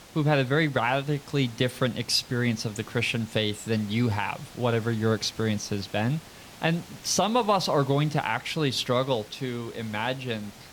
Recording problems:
hiss; noticeable; throughout; 20 dB below the speech

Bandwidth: 19 kHz